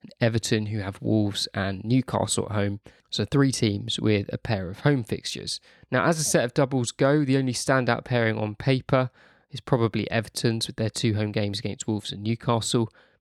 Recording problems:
none

